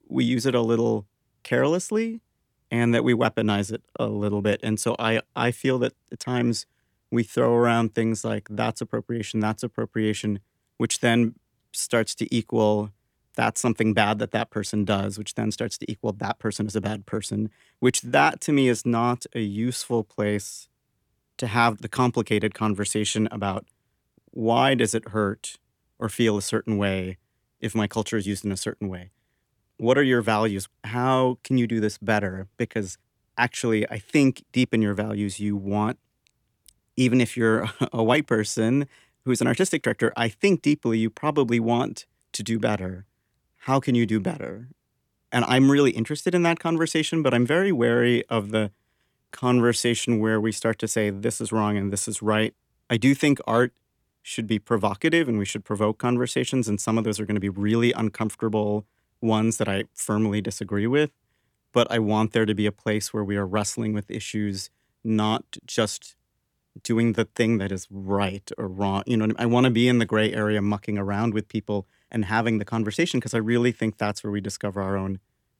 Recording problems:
none

